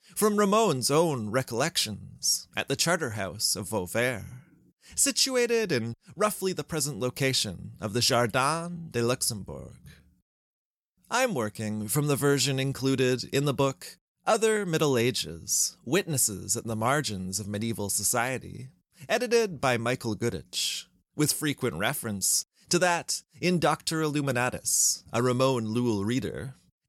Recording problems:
none

